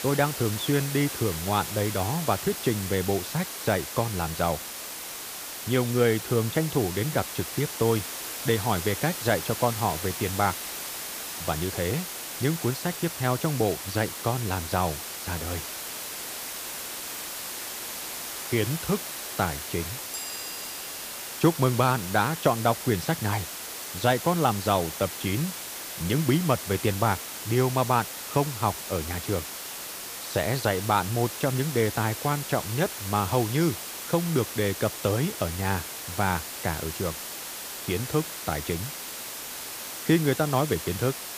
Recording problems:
hiss; loud; throughout; 6 dB below the speech

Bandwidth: 15 kHz